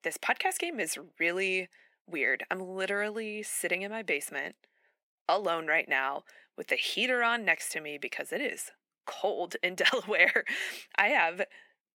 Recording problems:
thin; very; fading below 500 Hz

